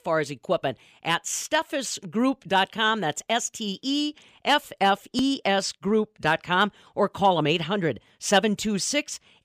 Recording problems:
none

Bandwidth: 15 kHz